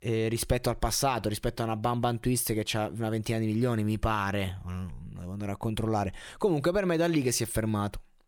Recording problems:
none

